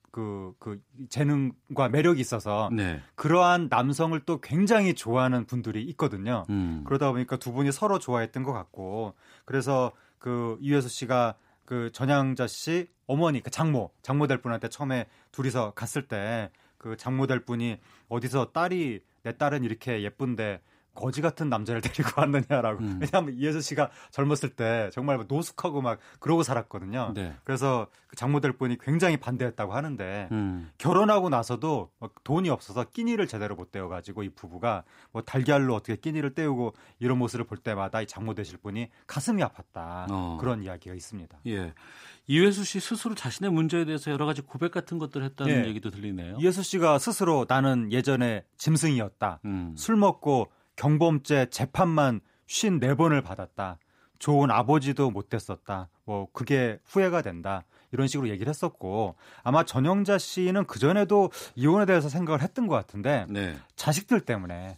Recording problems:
none

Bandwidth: 15.5 kHz